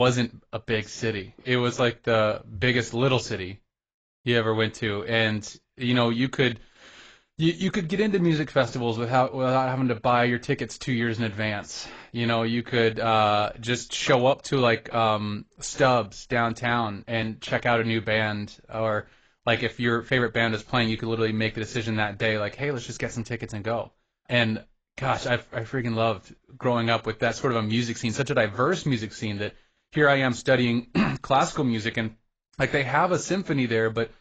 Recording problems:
garbled, watery; badly; nothing above 7.5 kHz
abrupt cut into speech; at the start

